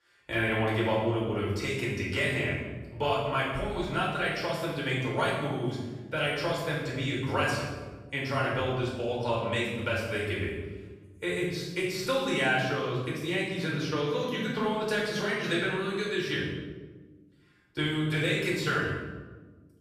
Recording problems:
off-mic speech; far
room echo; noticeable; dies away in 1.1 s

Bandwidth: 14.5 kHz